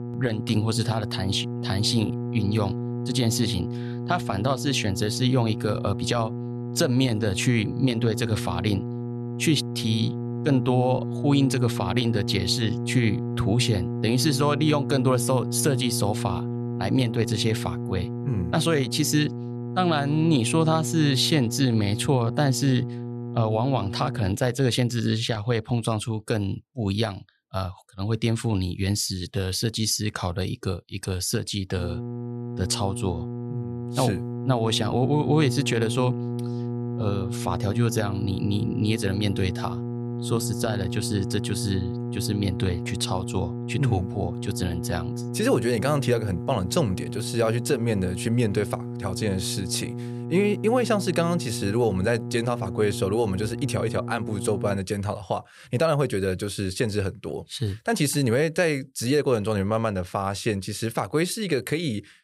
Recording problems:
electrical hum; noticeable; until 24 s and from 32 to 55 s; 60 Hz, 10 dB below the speech

